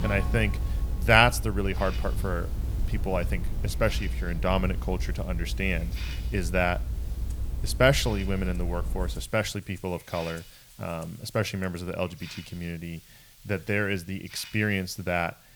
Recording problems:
background music; faint; until 12 s; 20 dB below the speech
hiss; faint; throughout; 20 dB below the speech
low rumble; faint; until 9 s; 20 dB below the speech

